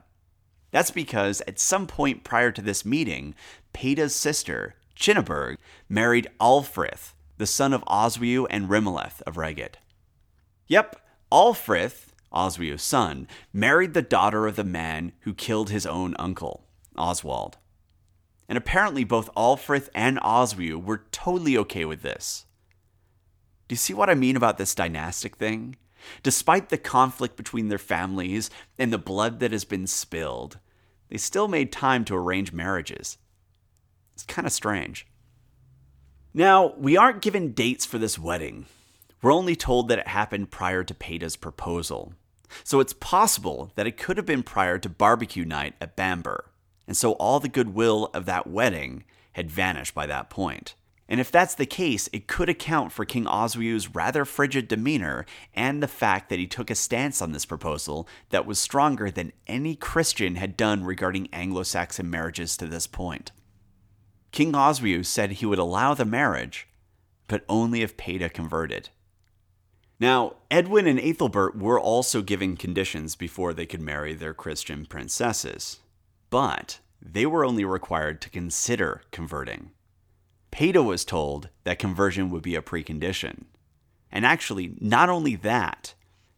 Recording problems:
none

